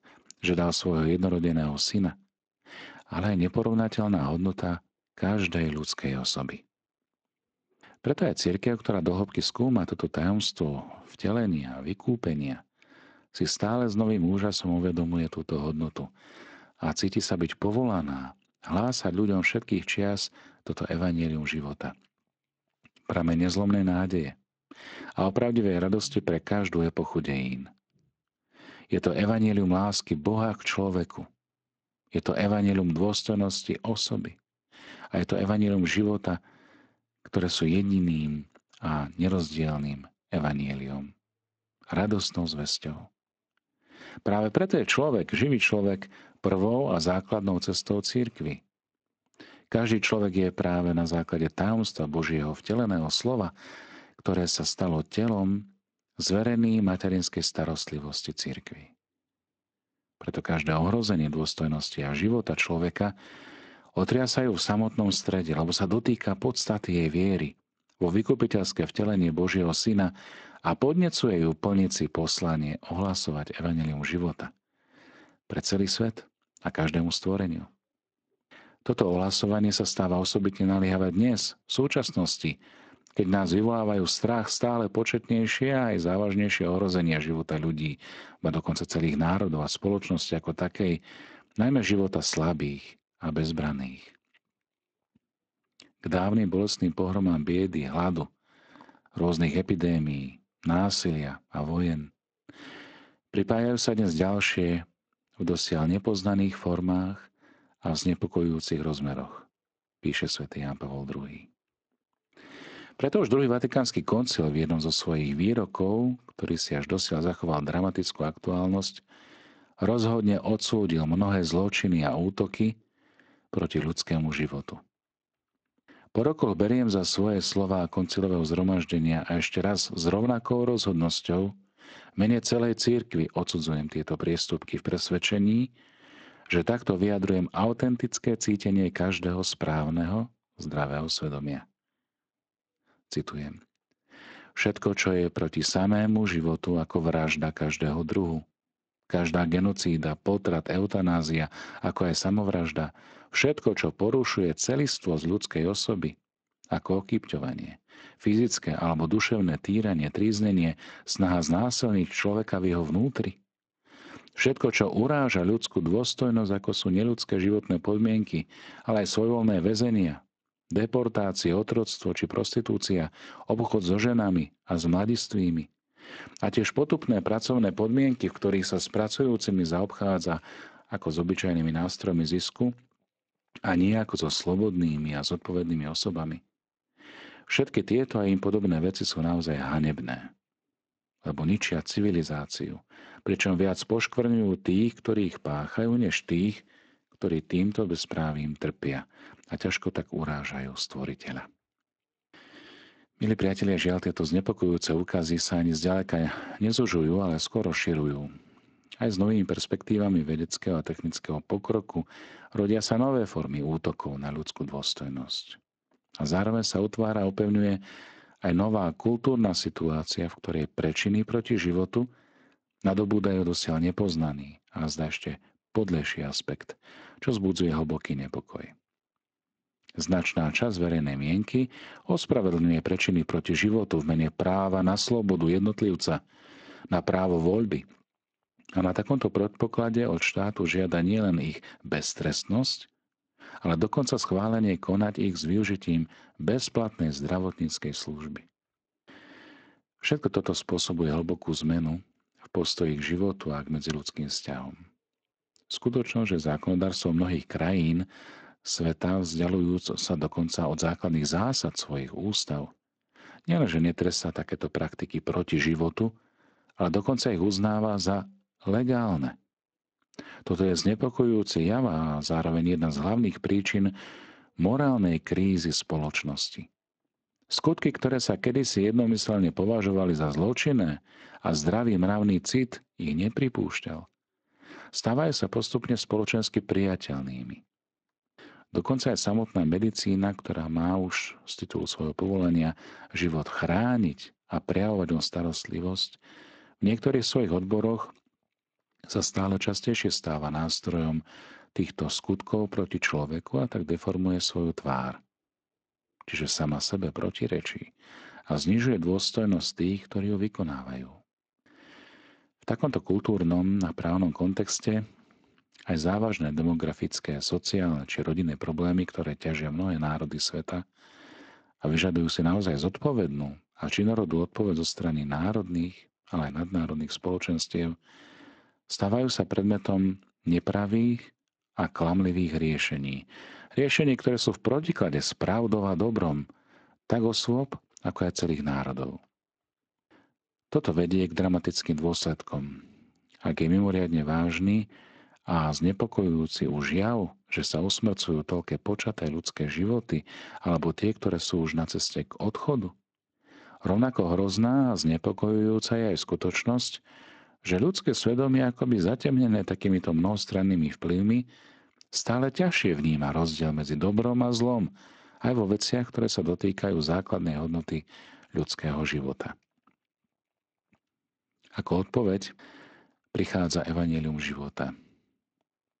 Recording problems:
garbled, watery; slightly; nothing above 8 kHz

